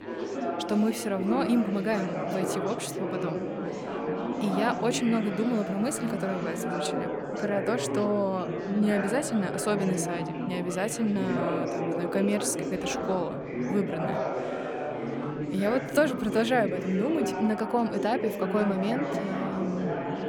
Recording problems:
chatter from many people; loud; throughout; 3 dB below the speech

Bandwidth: 18.5 kHz